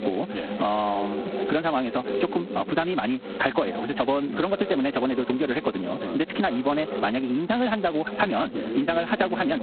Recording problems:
phone-call audio; poor line; nothing above 4 kHz
wrong speed, natural pitch; too fast; 1.6 times normal speed
squashed, flat; somewhat, background pumping
voice in the background; loud; throughout; 9 dB below the speech

